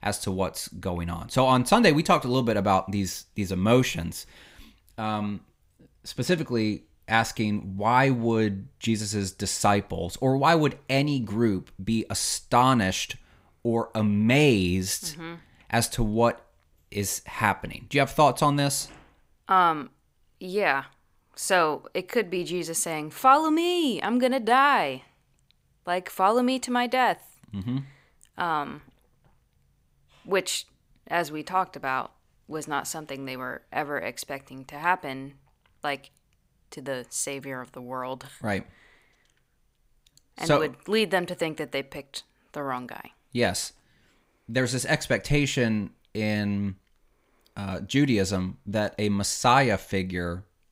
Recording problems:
none

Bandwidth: 15.5 kHz